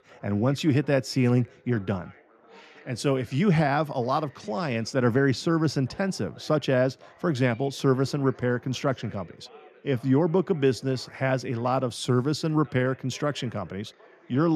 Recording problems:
background chatter; faint; throughout; 3 voices, 25 dB below the speech
abrupt cut into speech; at the end

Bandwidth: 13.5 kHz